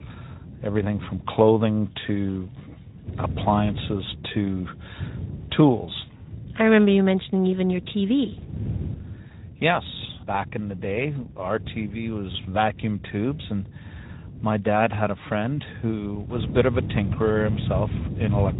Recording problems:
high frequencies cut off; severe; nothing above 4 kHz
garbled, watery; slightly
wind noise on the microphone; occasional gusts; 20 dB below the speech

